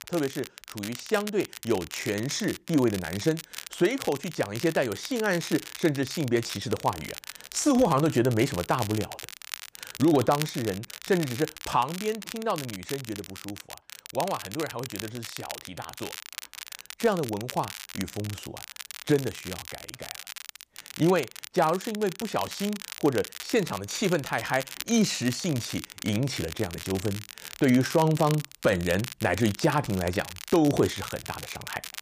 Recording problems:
crackle, like an old record; noticeable; 10 dB below the speech

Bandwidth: 15 kHz